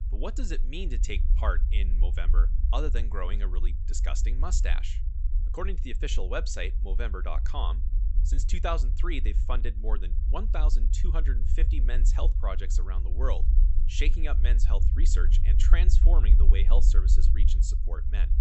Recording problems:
high frequencies cut off; noticeable; nothing above 8 kHz
low rumble; noticeable; throughout; 10 dB below the speech

